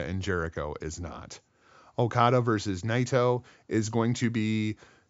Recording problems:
high frequencies cut off; noticeable; nothing above 7.5 kHz
abrupt cut into speech; at the start

